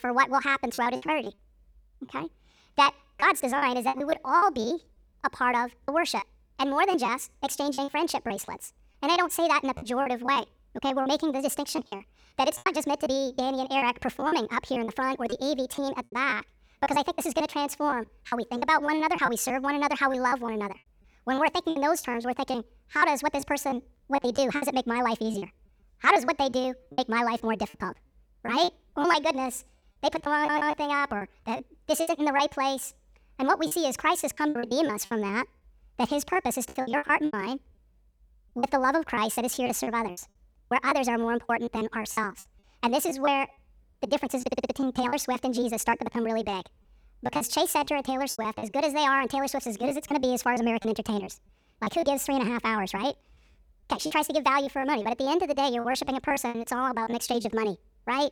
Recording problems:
wrong speed and pitch; too fast and too high; 1.6 times normal speed
choppy; very; 11% of the speech affected
audio stuttering; at 30 s and at 44 s

